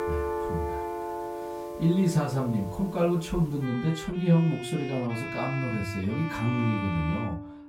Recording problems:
off-mic speech; far
room echo; very slight; dies away in 0.2 s
background music; loud; throughout; 7 dB below the speech

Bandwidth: 16 kHz